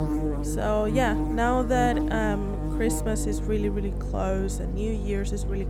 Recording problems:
electrical hum; loud; throughout; 50 Hz, 7 dB below the speech

